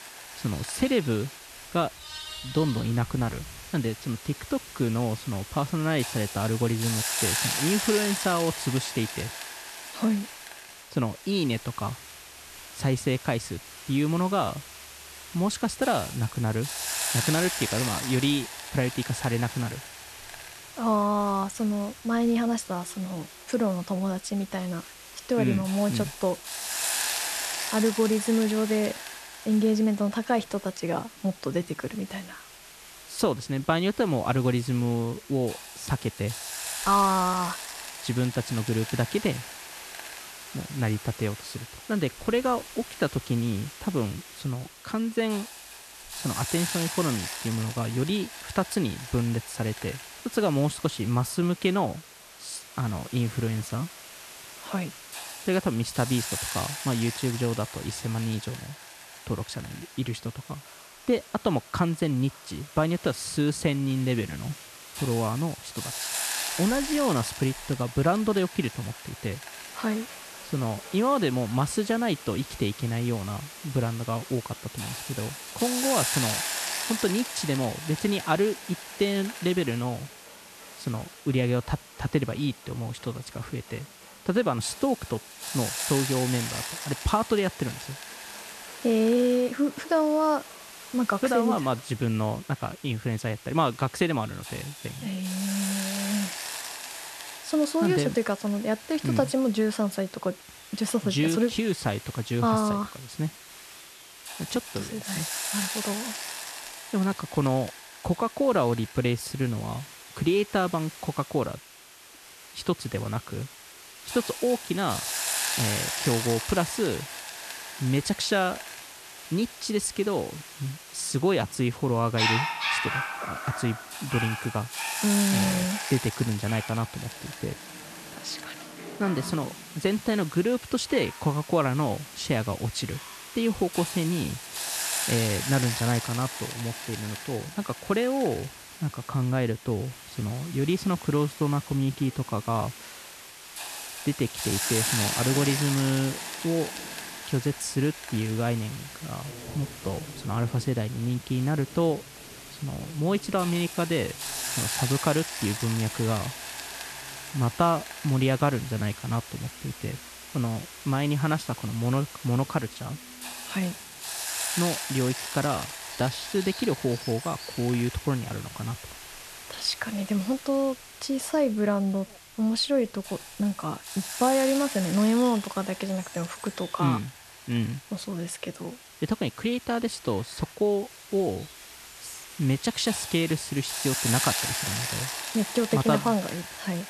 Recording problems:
hiss; loud; throughout; 7 dB below the speech
animal sounds; noticeable; throughout; 15 dB below the speech

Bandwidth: 13.5 kHz